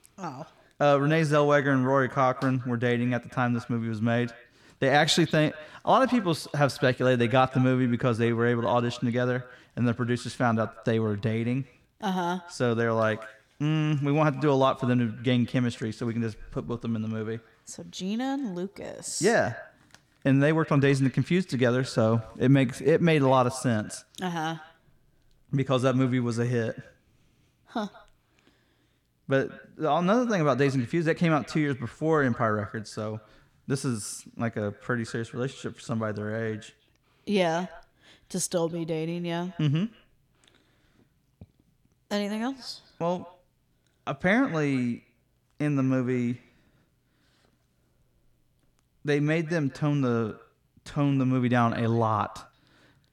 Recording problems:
echo of what is said; faint; throughout; 180 ms later, 20 dB below the speech

